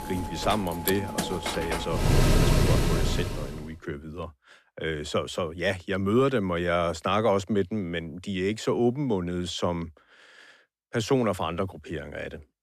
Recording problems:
machinery noise; very loud; until 3 s; 2 dB above the speech

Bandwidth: 14 kHz